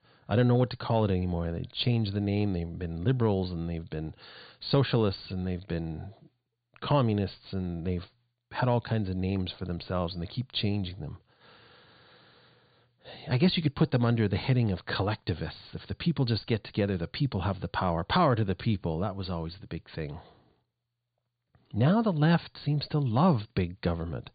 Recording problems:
high frequencies cut off; severe; nothing above 4.5 kHz

